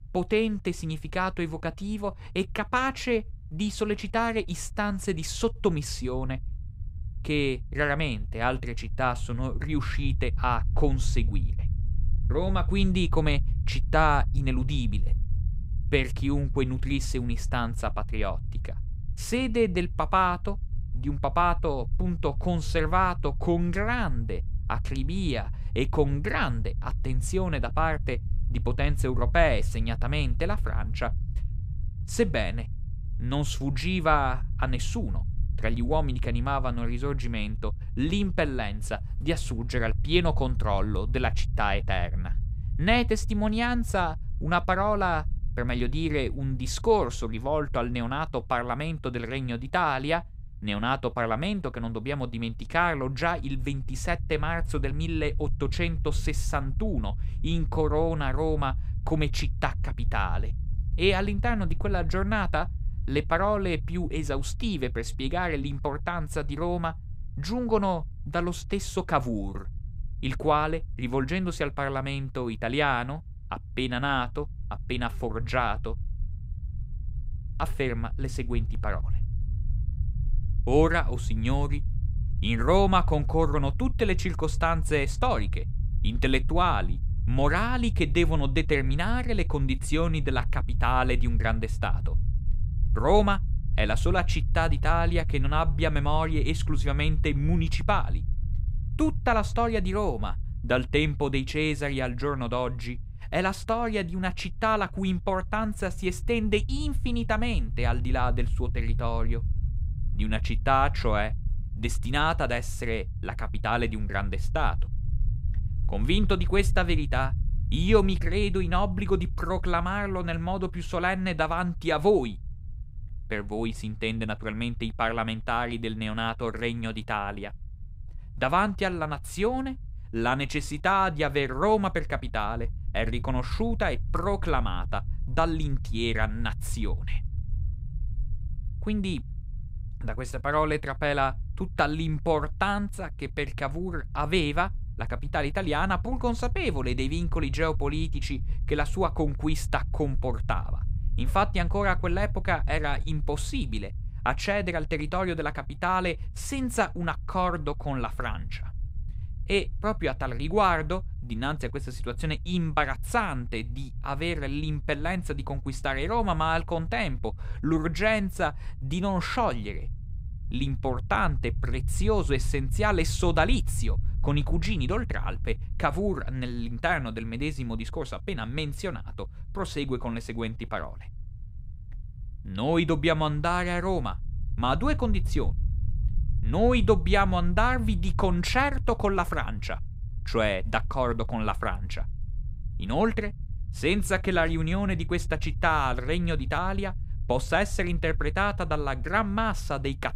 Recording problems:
low rumble; faint; throughout; 25 dB below the speech

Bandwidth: 15.5 kHz